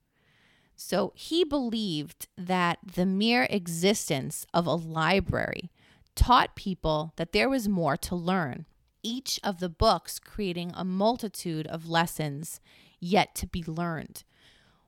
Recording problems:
none

